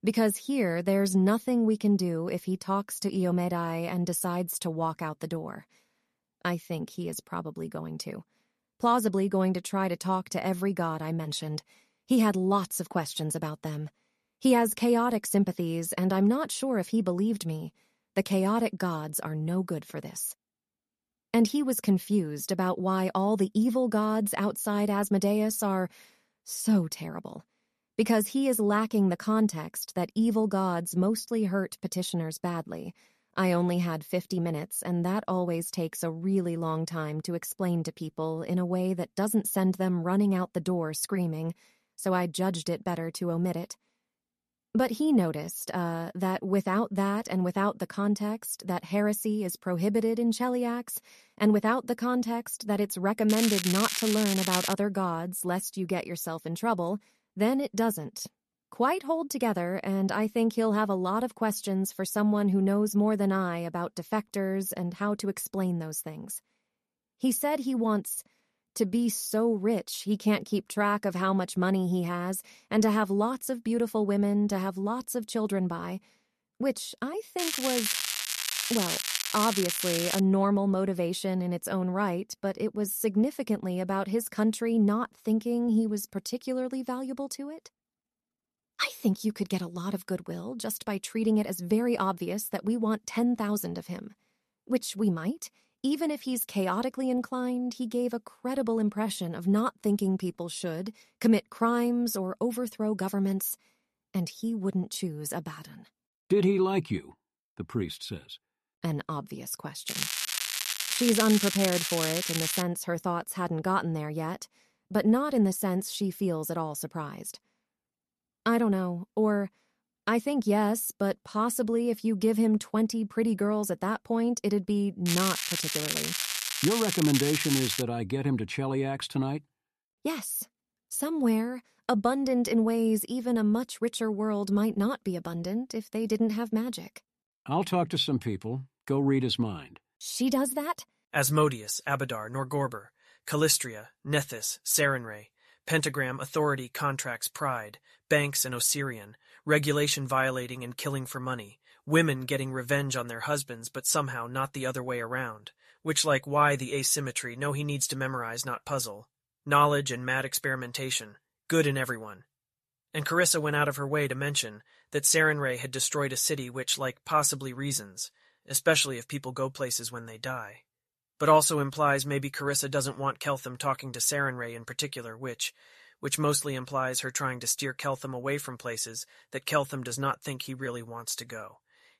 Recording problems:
crackling; loud; 4 times, first at 53 s; 1 dB below the speech

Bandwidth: 13.5 kHz